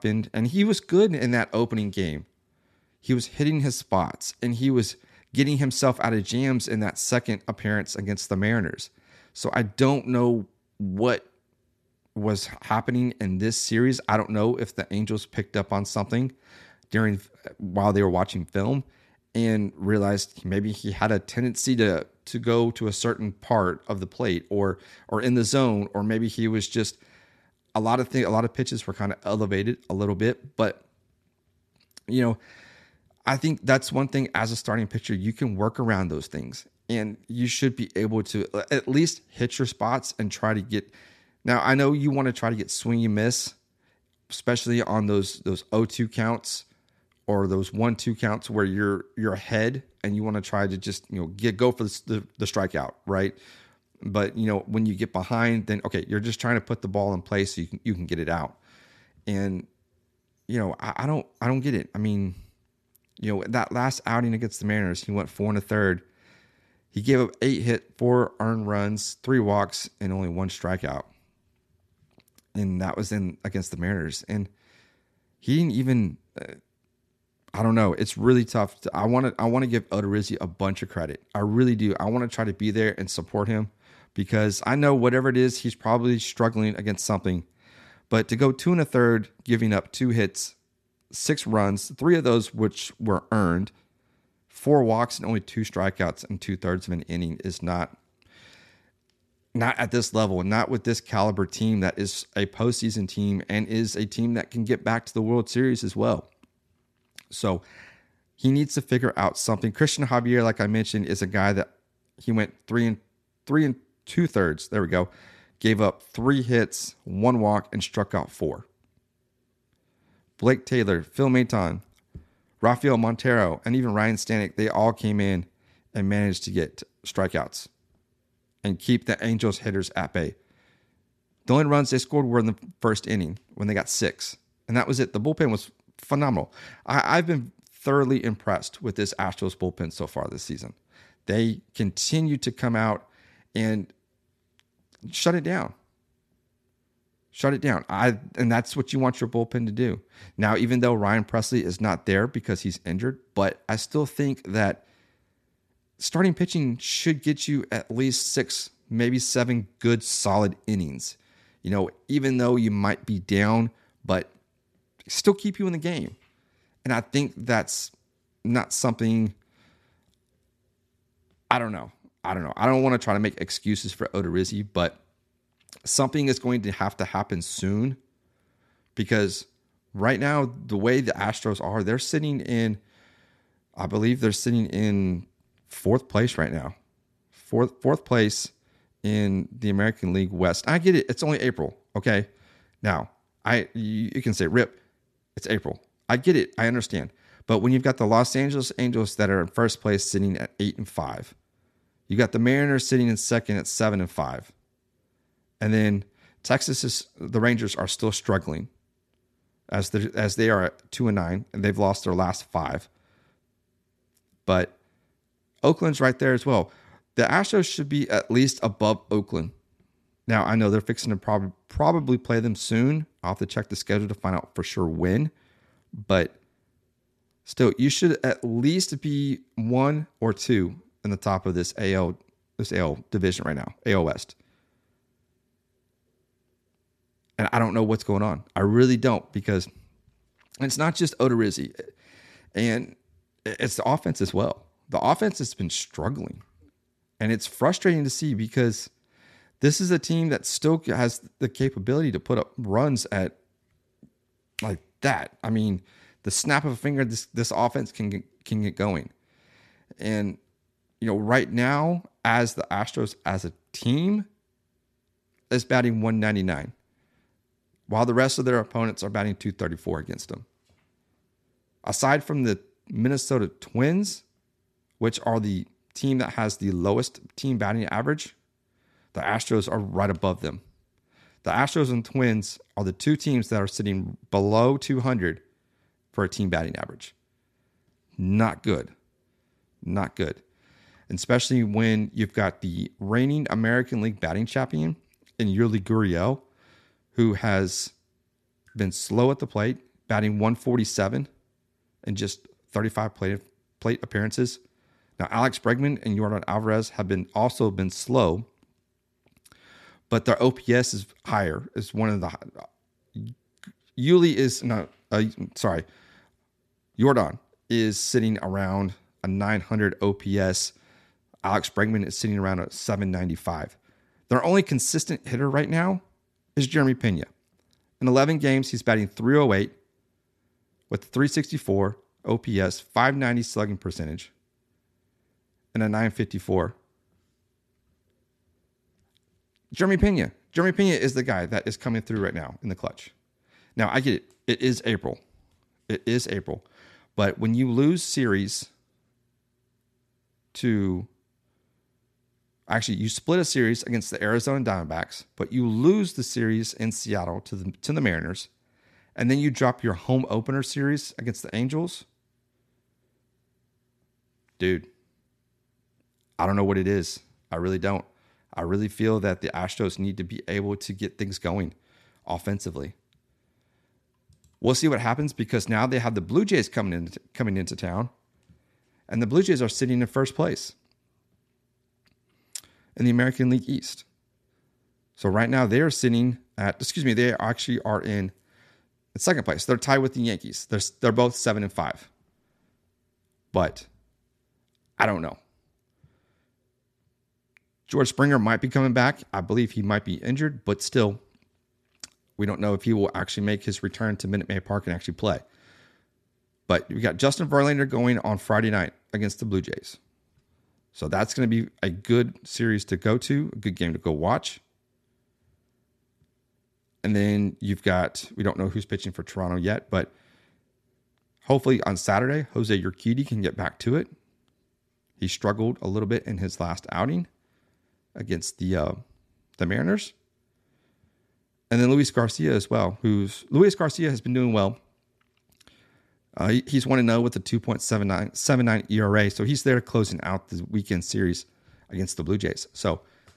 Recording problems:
none

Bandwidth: 13.5 kHz